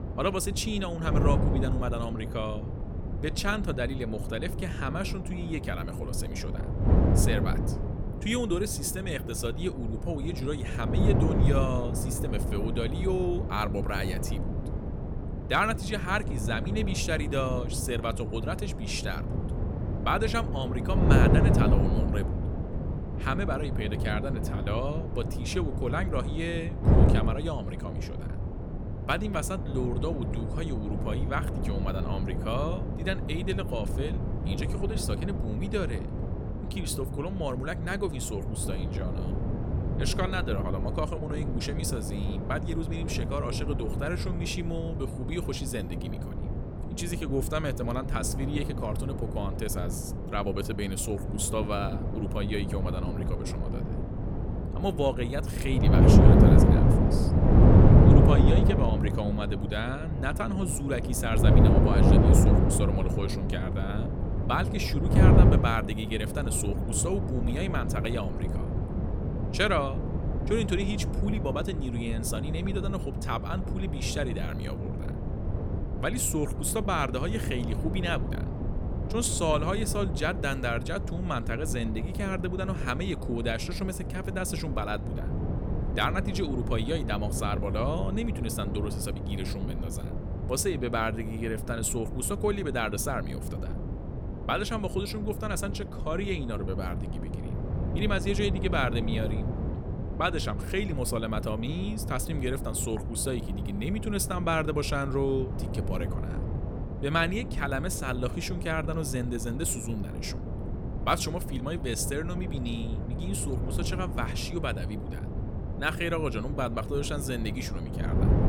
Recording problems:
wind noise on the microphone; heavy; 4 dB below the speech

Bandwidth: 17 kHz